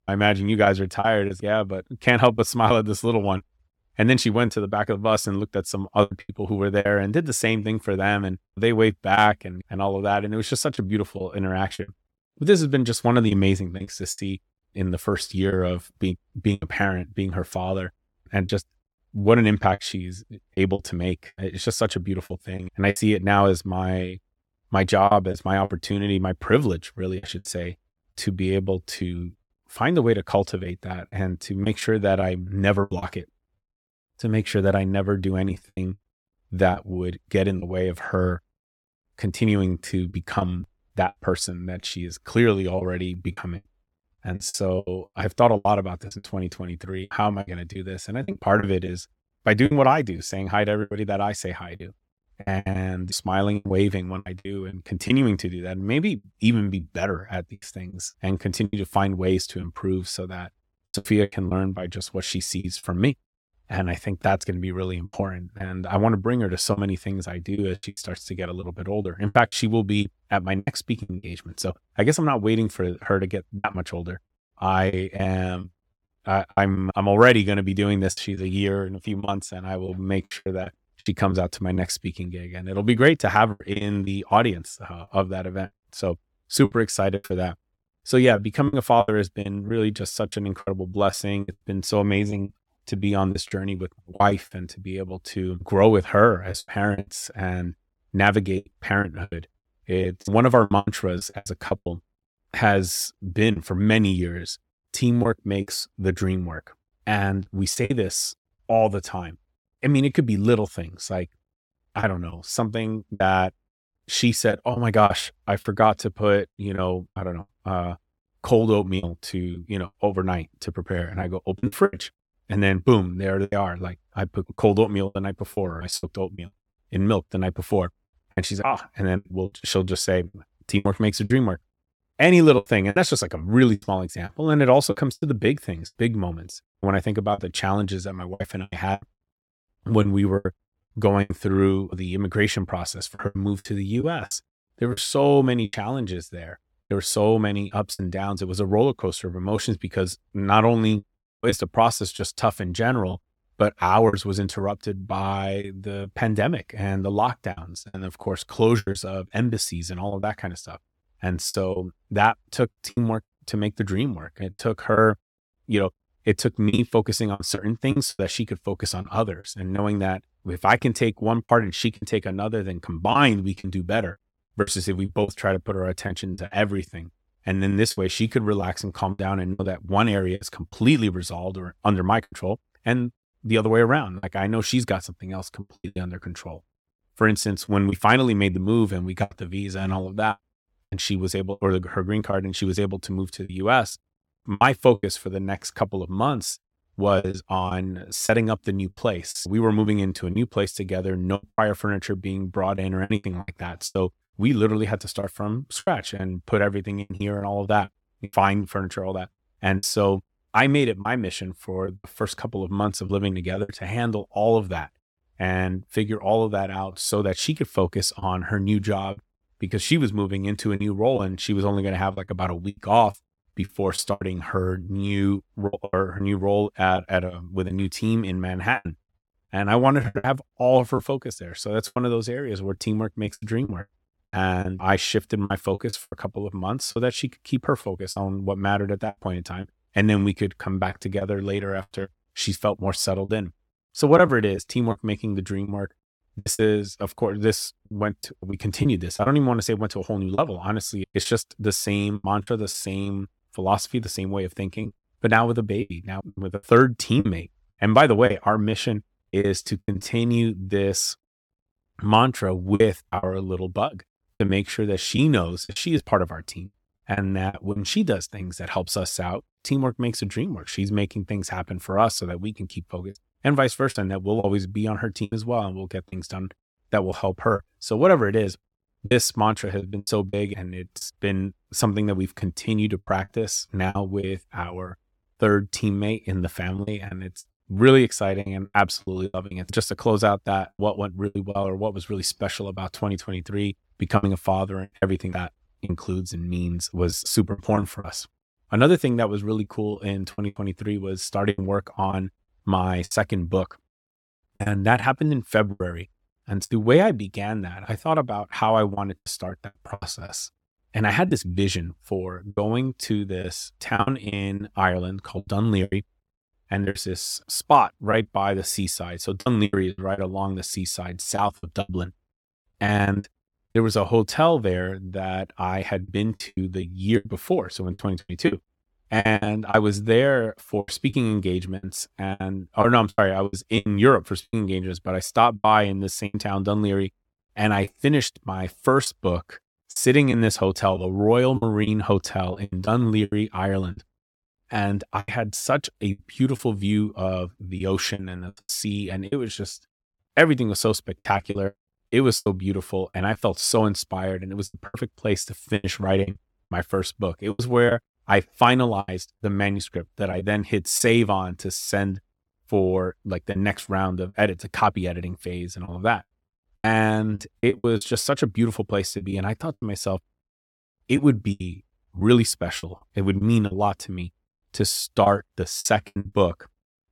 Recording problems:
choppy; very; 8% of the speech affected

